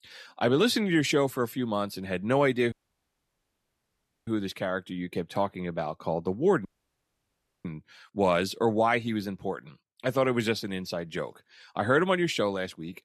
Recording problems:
audio cutting out; at 2.5 s for 1.5 s and at 6.5 s for 1 s

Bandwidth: 13.5 kHz